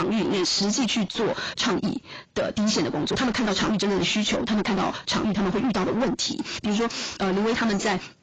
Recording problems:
distortion; heavy; 7 dB below the speech
garbled, watery; badly; nothing above 7.5 kHz
wrong speed, natural pitch; too fast; 1.6 times normal speed
abrupt cut into speech; at the start

